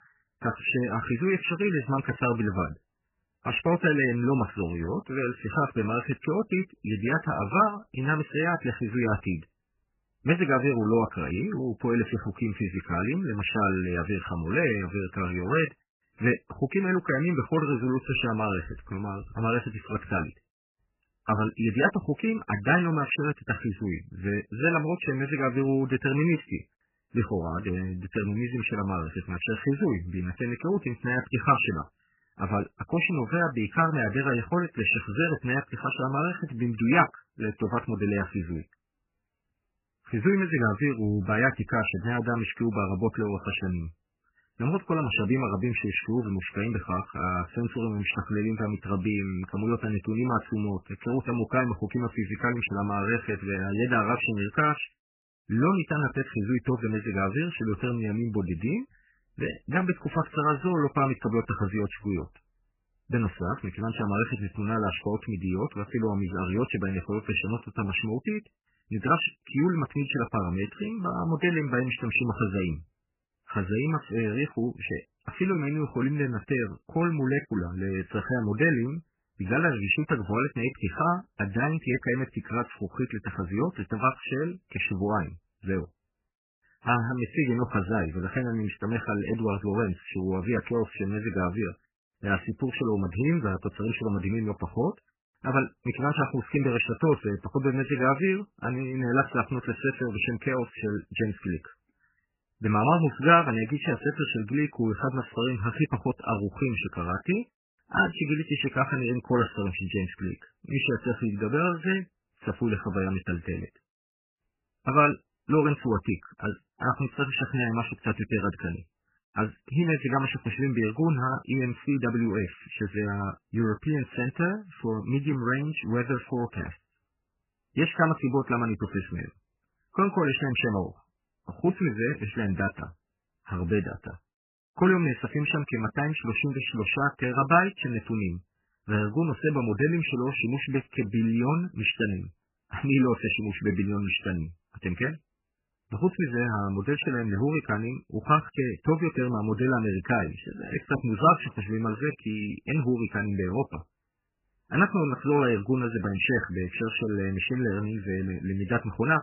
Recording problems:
garbled, watery; badly; nothing above 3 kHz

